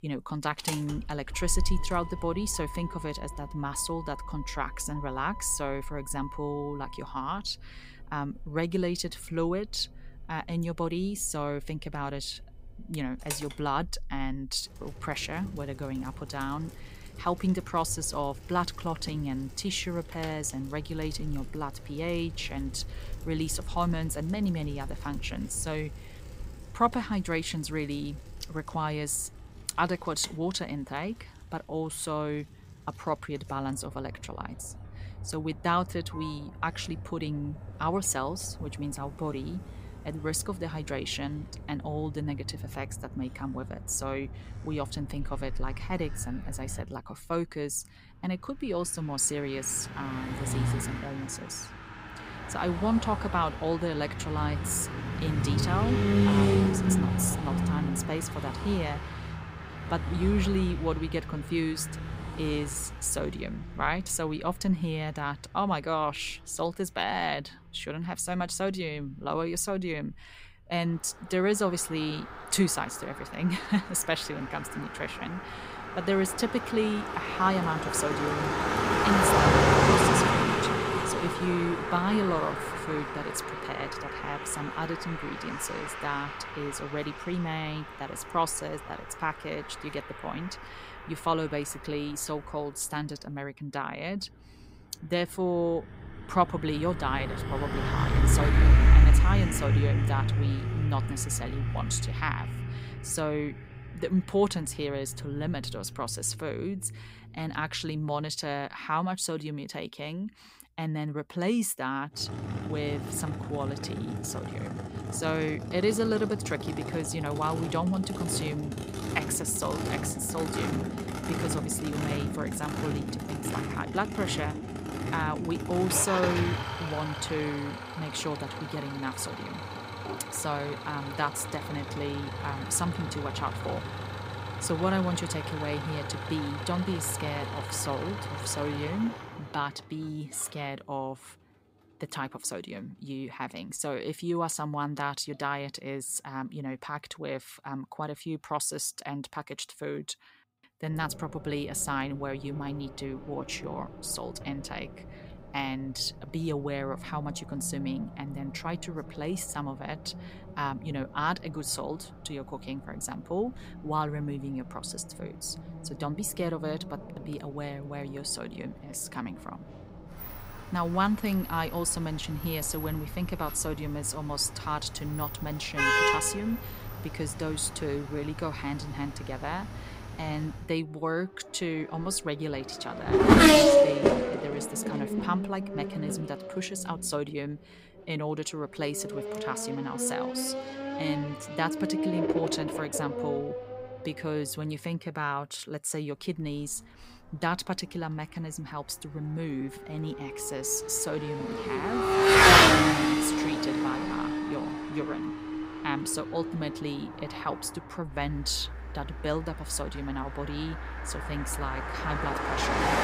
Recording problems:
traffic noise; very loud; throughout; 3 dB above the speech

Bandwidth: 15.5 kHz